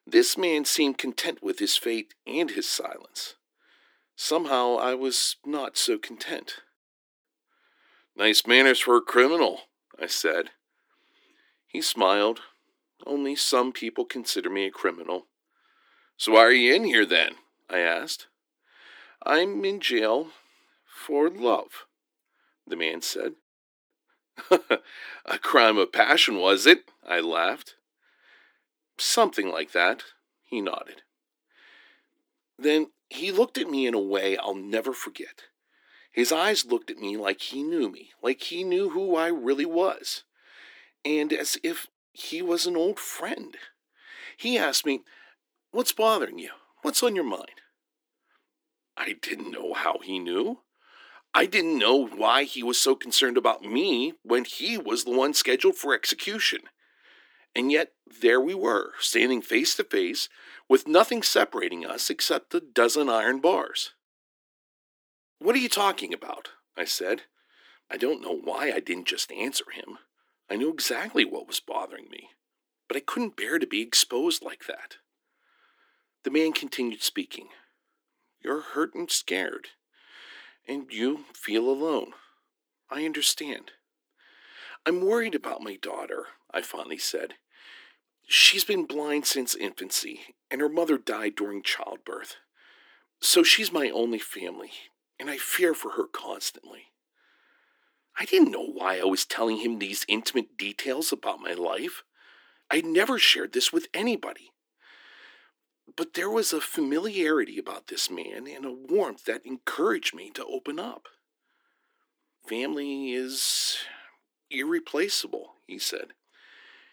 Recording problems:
thin; somewhat; fading below 300 Hz

